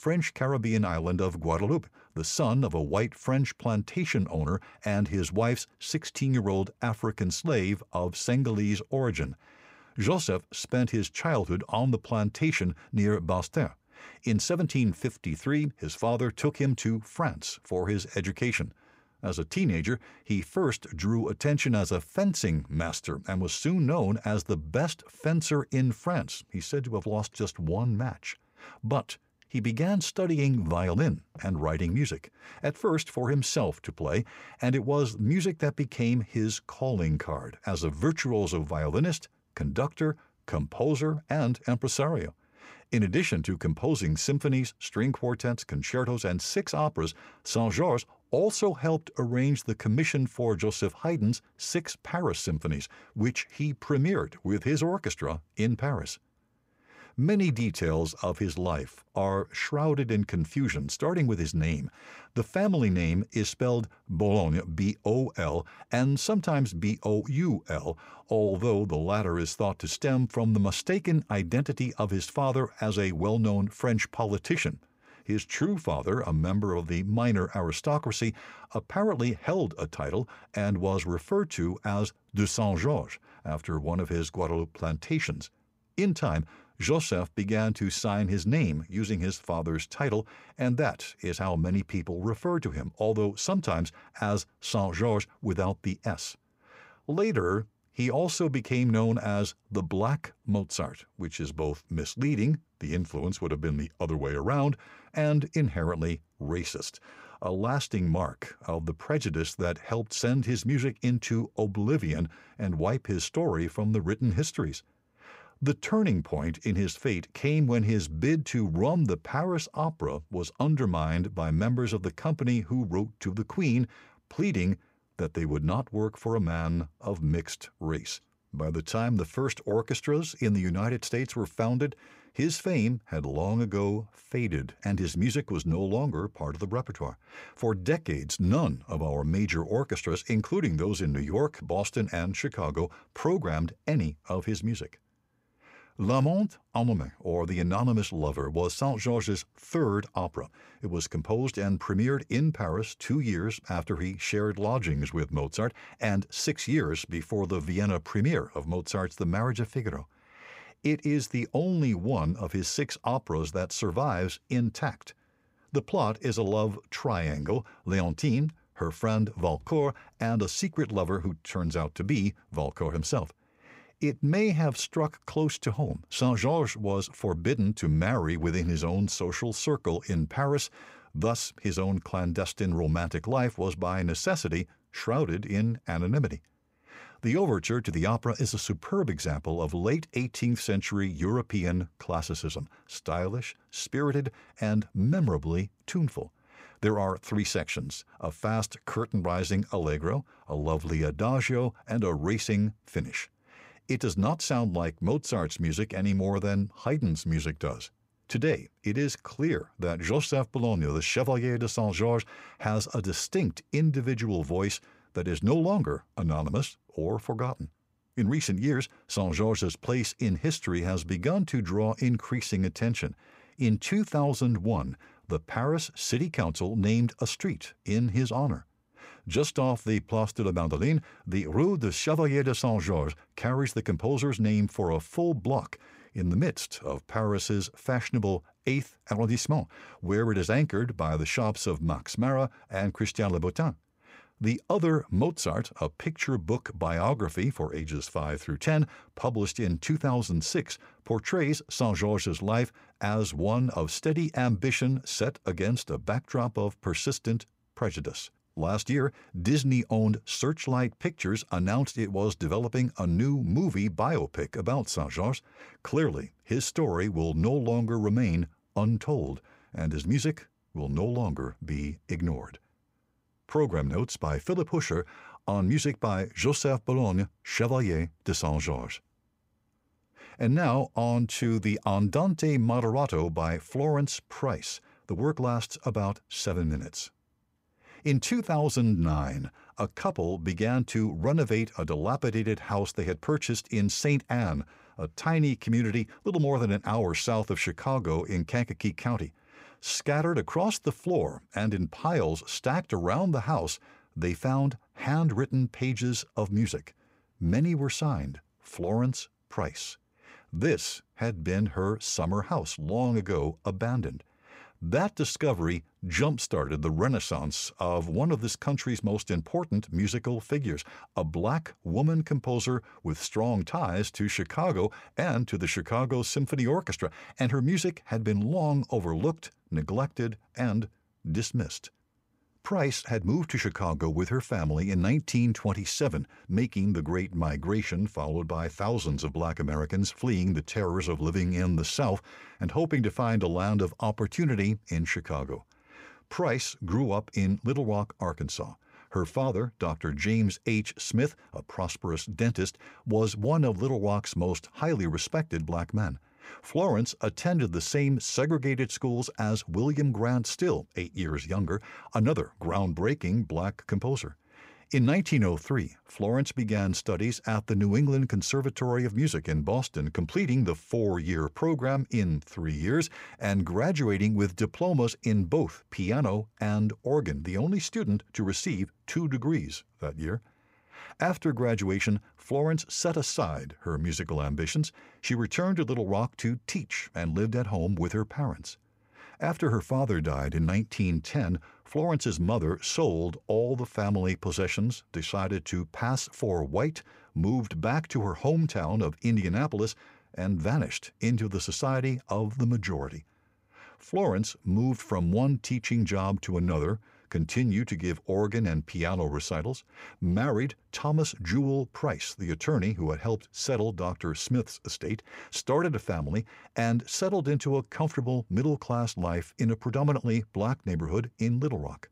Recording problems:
none

